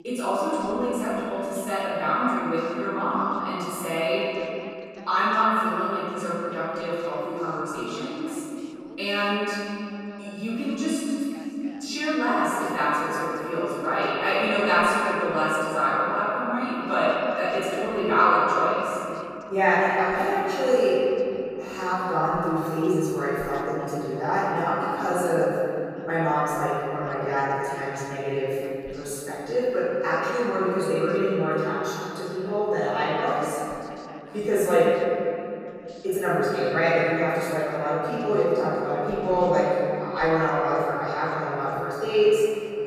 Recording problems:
room echo; strong; dies away in 3 s
off-mic speech; far
voice in the background; faint; throughout; 25 dB below the speech

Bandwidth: 14.5 kHz